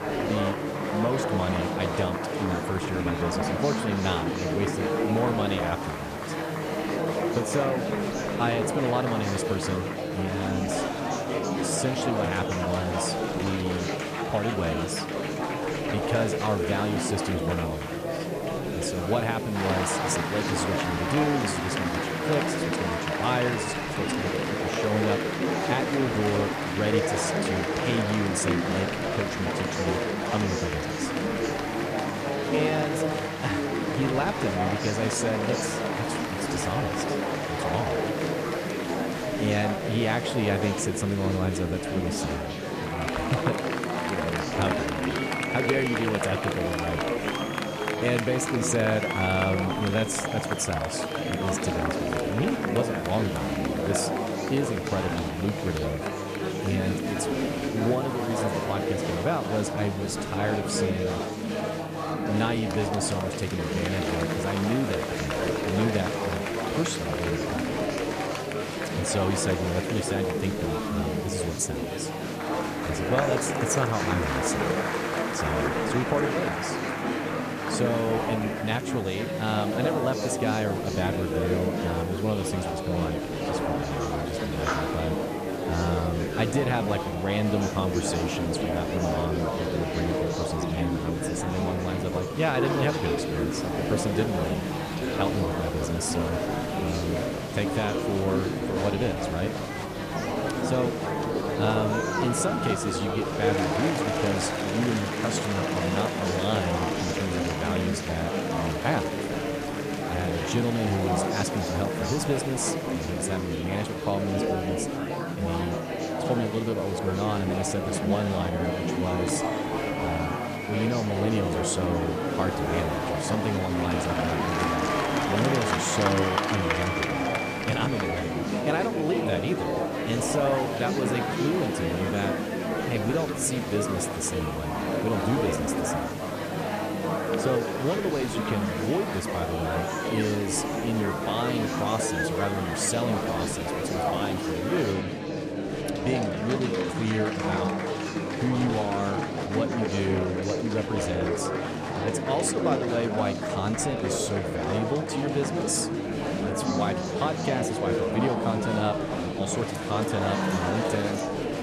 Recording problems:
murmuring crowd; very loud; throughout; 1 dB above the speech
electrical hum; noticeable; throughout; 50 Hz, 20 dB below the speech
hiss; noticeable; until 2:25; 20 dB below the speech

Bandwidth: 14.5 kHz